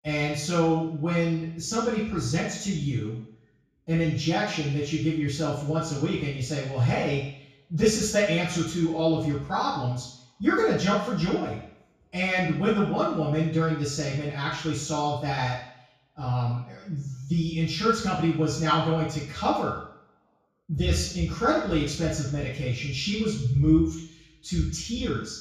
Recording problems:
off-mic speech; far
room echo; noticeable; dies away in 0.6 s

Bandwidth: 15 kHz